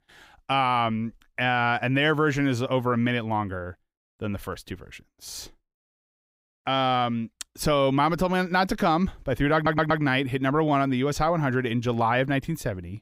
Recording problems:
audio stuttering; at 9.5 s

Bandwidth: 15.5 kHz